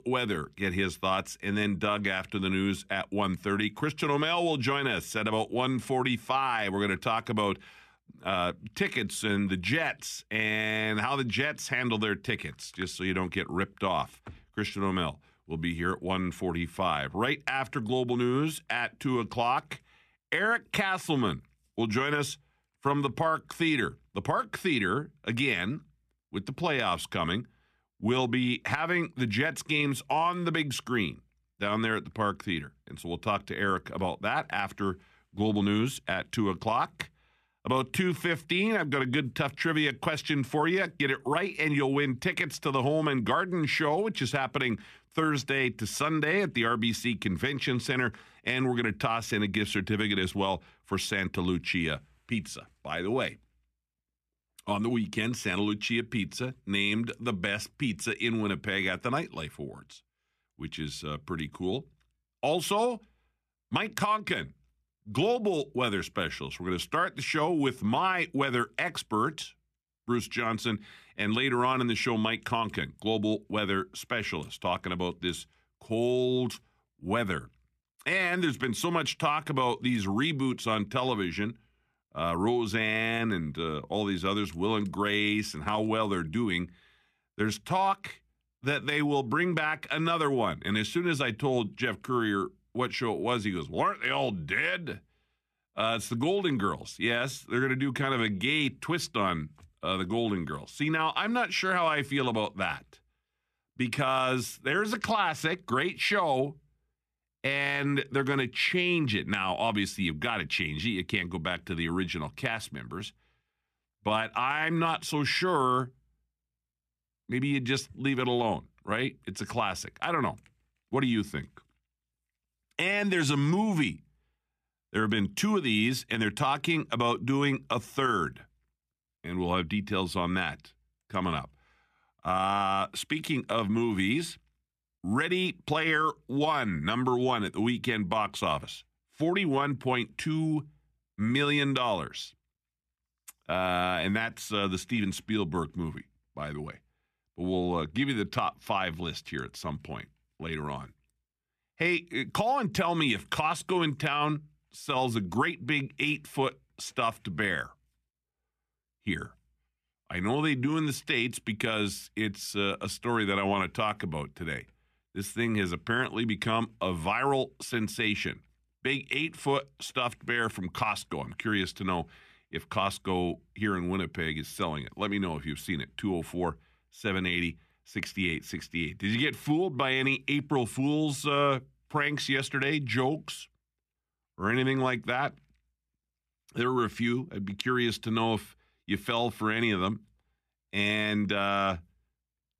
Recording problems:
none

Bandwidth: 14.5 kHz